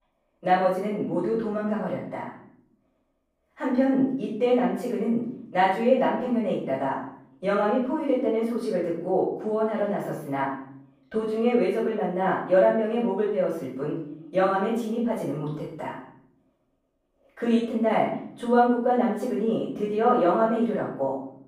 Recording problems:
off-mic speech; far
room echo; noticeable; dies away in 0.7 s

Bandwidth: 15.5 kHz